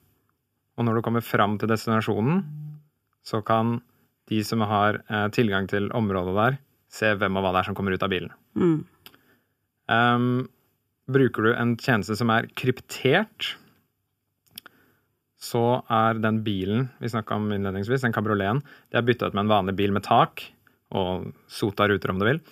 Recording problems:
none

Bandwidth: 15 kHz